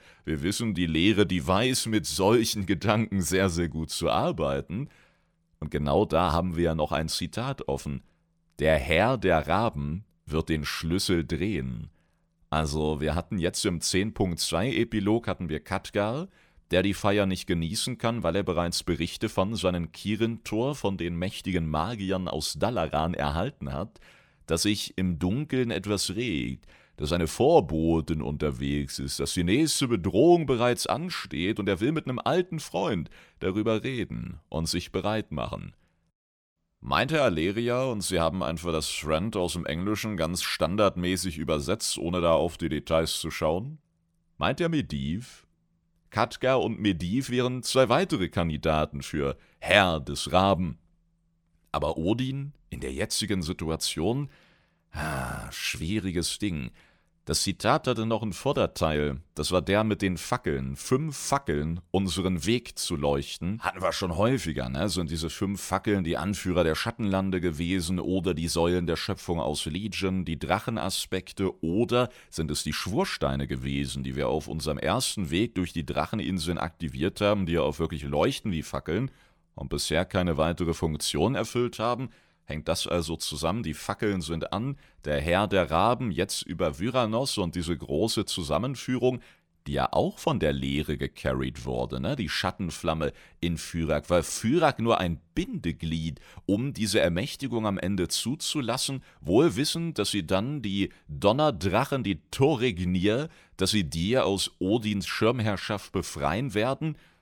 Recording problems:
none

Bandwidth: 18.5 kHz